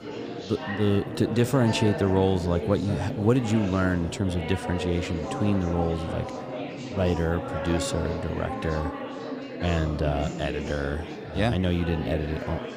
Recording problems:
chatter from many people; loud; throughout; 7 dB below the speech

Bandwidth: 15 kHz